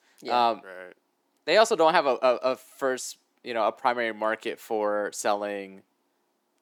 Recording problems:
thin; somewhat; fading below 300 Hz

